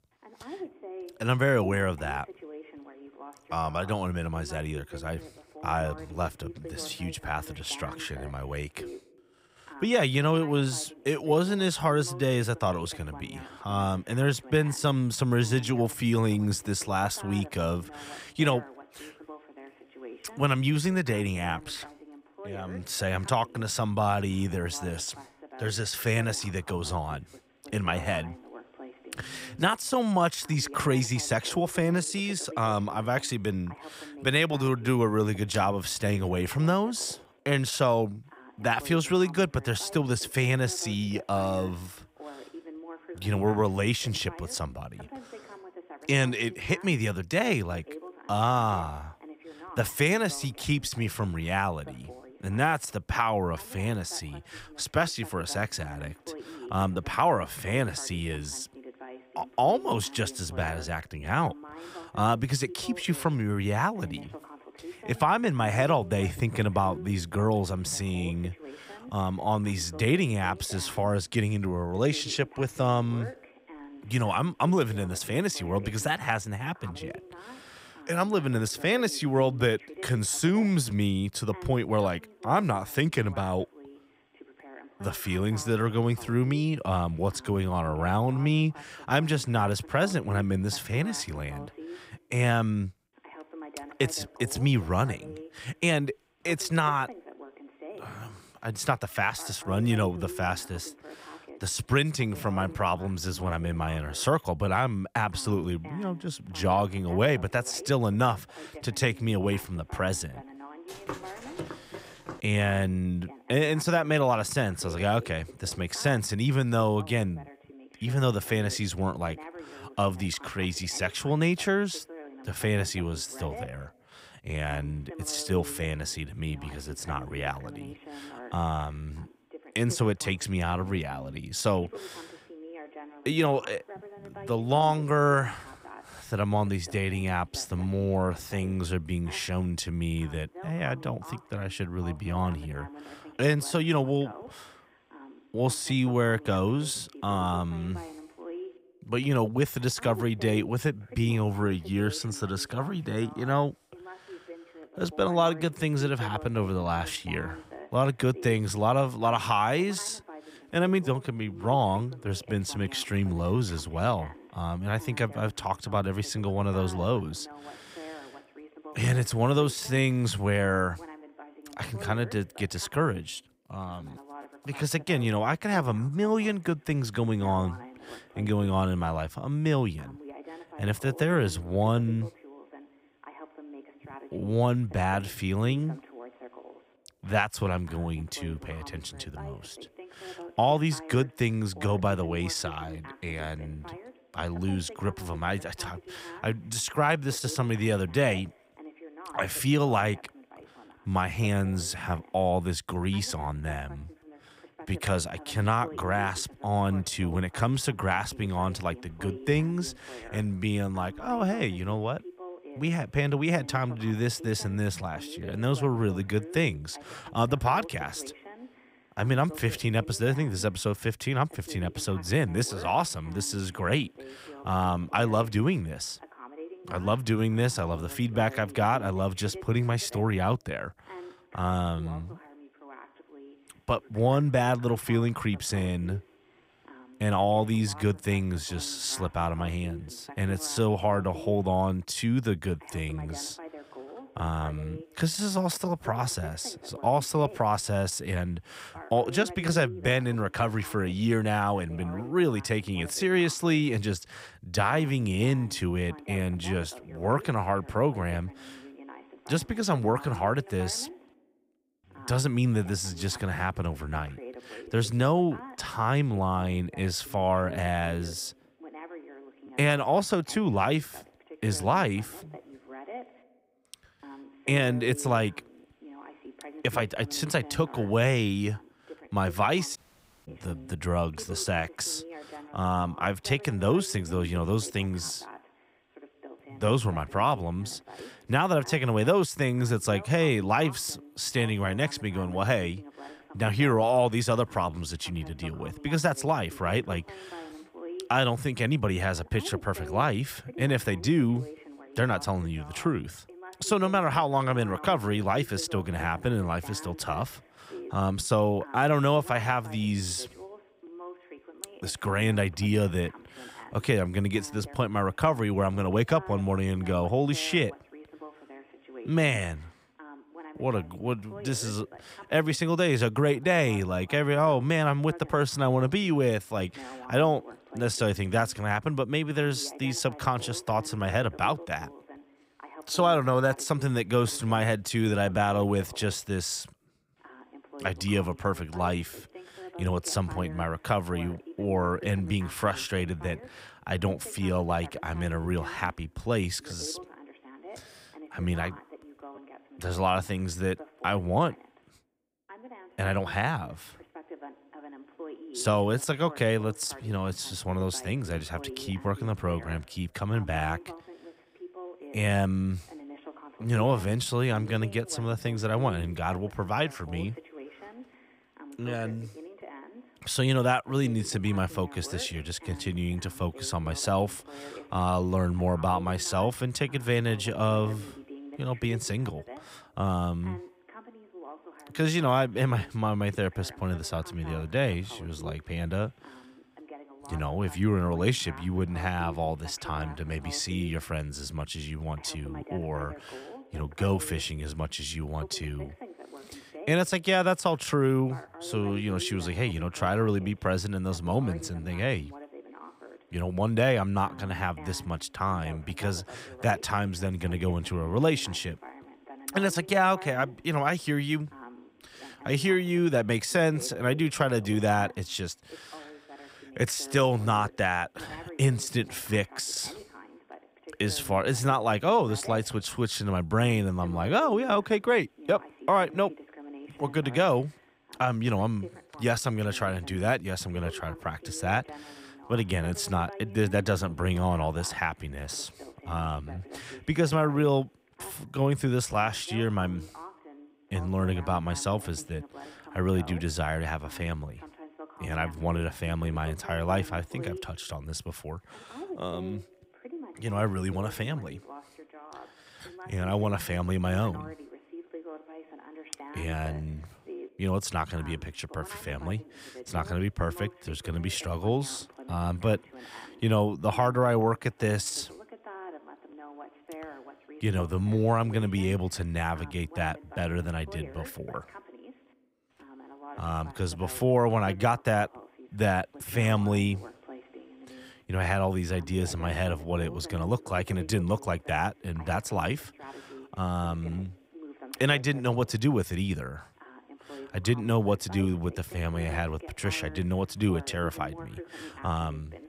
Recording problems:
voice in the background; noticeable; throughout; 20 dB below the speech
footsteps; faint; from 1:51 to 1:52; peak 10 dB below the speech
audio cutting out; at 4:40 for 0.5 s

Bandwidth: 15.5 kHz